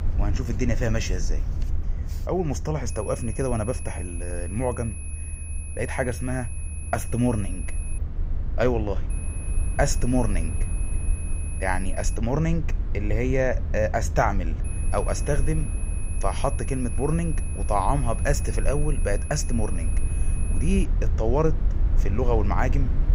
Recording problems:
high-pitched whine; noticeable; from 3 to 8 s, from 9 to 12 s and from 15 to 21 s; 10.5 kHz, 10 dB below the speech
low rumble; noticeable; throughout; 15 dB below the speech

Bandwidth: 15.5 kHz